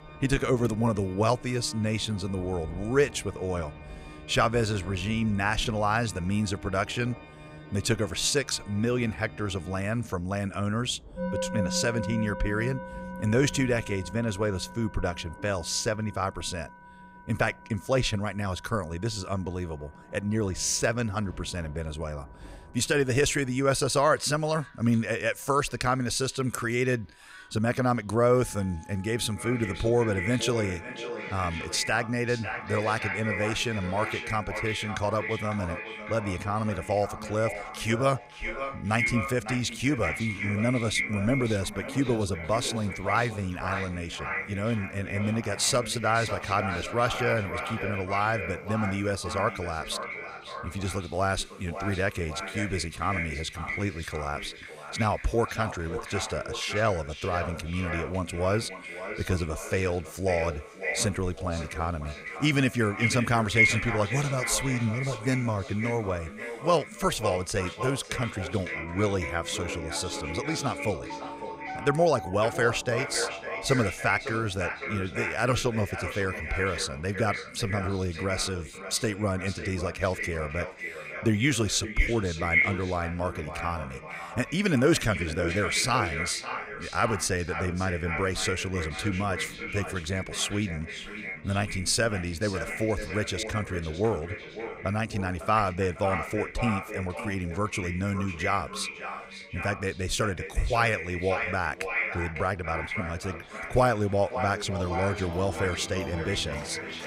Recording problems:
echo of what is said; strong; from 29 s on; 550 ms later, 6 dB below the speech
background music; noticeable; throughout; 15 dB below the speech
rain or running water; faint; throughout; 25 dB below the speech

